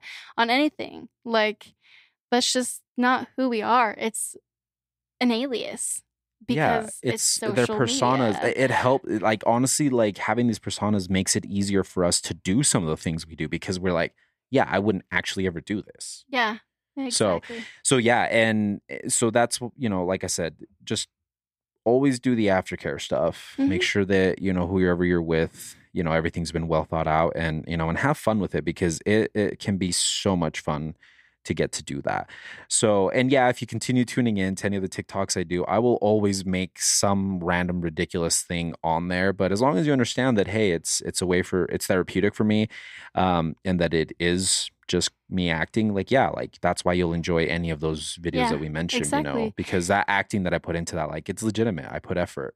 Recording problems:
none

